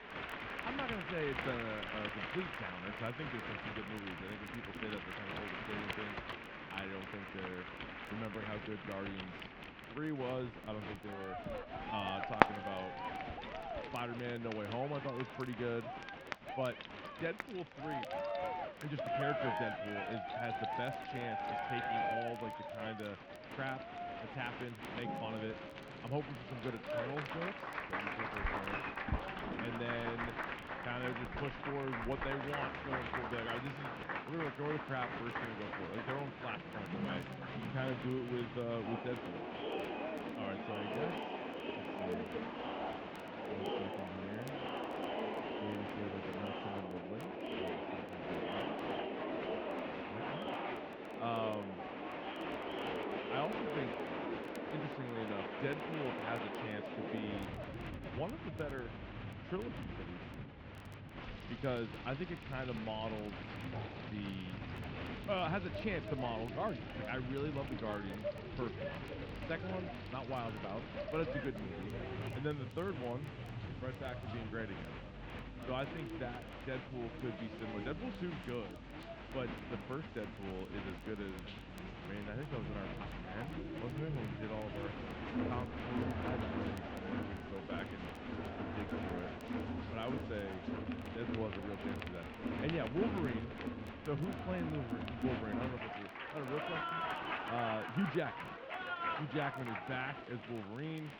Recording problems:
muffled; very; fading above 3 kHz
crowd noise; very loud; throughout; as loud as the speech
household noises; loud; throughout; 7 dB below the speech
crackle, like an old record; faint; 25 dB below the speech

